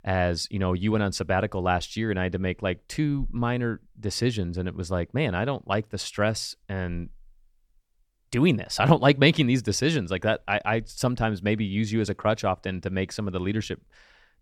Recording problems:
none

